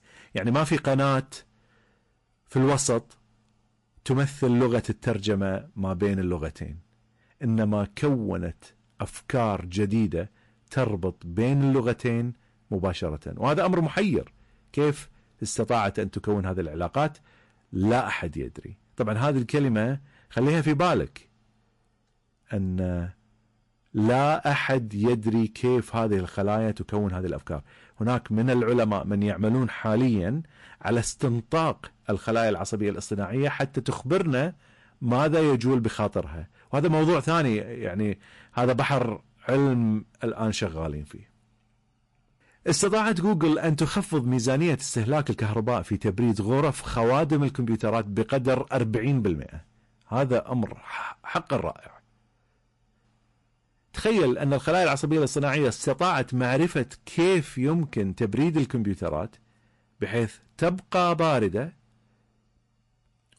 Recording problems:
distortion; slight; 6% of the sound clipped
garbled, watery; slightly; nothing above 11 kHz

